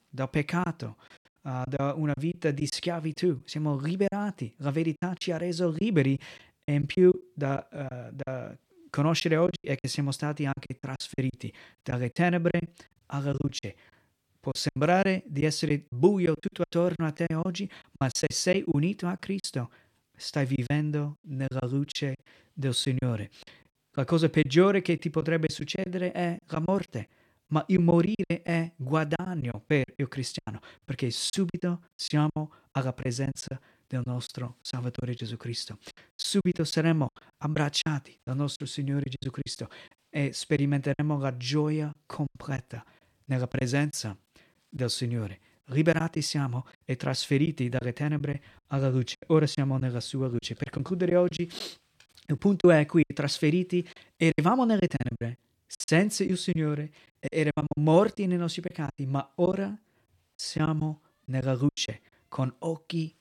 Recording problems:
choppy; very; 10% of the speech affected

